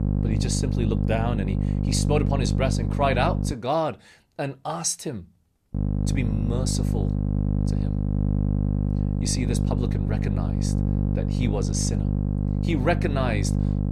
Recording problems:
electrical hum; loud; until 3.5 s and from 5.5 s on; 50 Hz, 6 dB below the speech

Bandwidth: 14 kHz